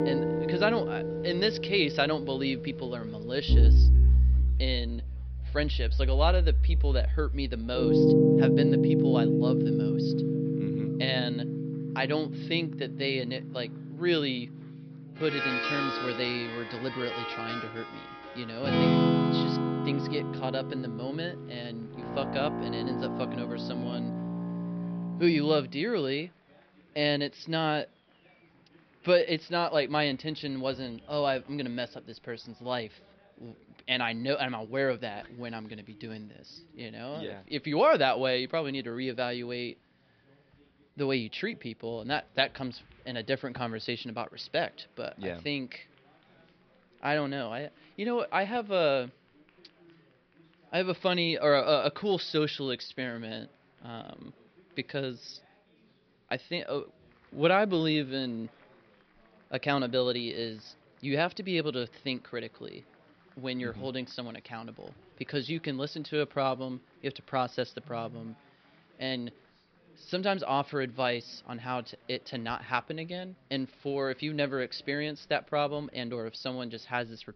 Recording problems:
high frequencies cut off; noticeable; nothing above 5.5 kHz
background music; very loud; until 25 s; 4 dB above the speech
chatter from many people; faint; throughout; 30 dB below the speech

